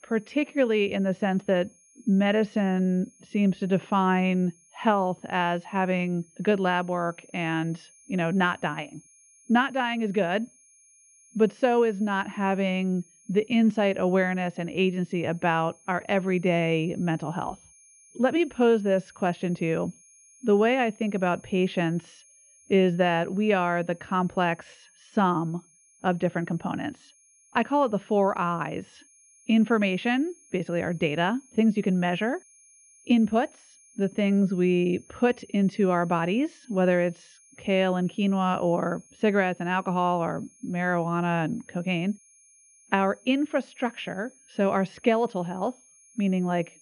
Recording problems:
muffled; very; fading above 2.5 kHz
high-pitched whine; faint; throughout; 6.5 kHz, 30 dB below the speech

